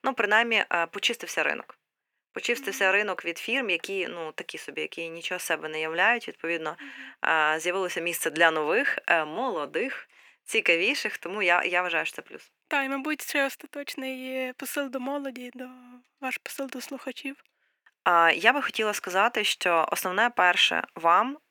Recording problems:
thin; somewhat; fading below 450 Hz

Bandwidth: 19 kHz